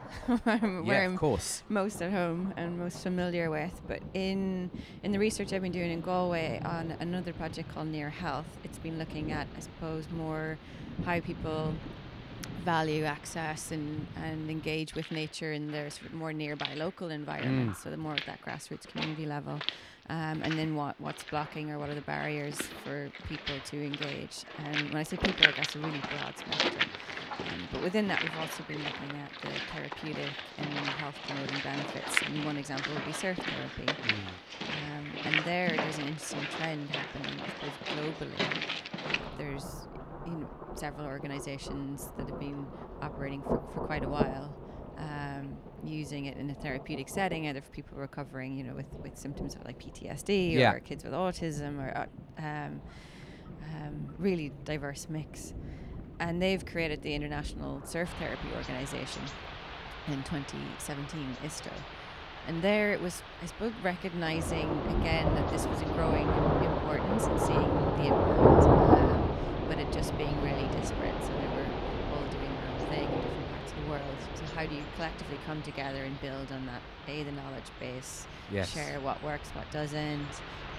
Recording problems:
rain or running water; very loud; throughout; 2 dB above the speech

